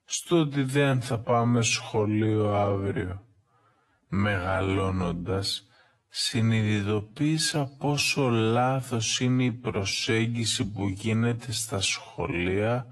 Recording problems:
wrong speed, natural pitch; too slow; 0.5 times normal speed
garbled, watery; slightly; nothing above 11.5 kHz

